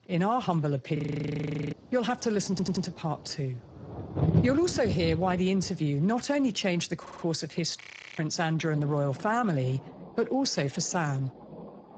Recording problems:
garbled, watery; badly; nothing above 7.5 kHz
rain or running water; loud; throughout; 7 dB below the speech
audio freezing; at 1 s for 1 s and at 8 s
audio stuttering; at 2.5 s and at 7 s

